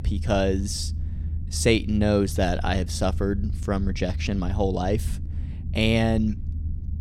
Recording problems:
low rumble; noticeable; throughout; 20 dB below the speech

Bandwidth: 16 kHz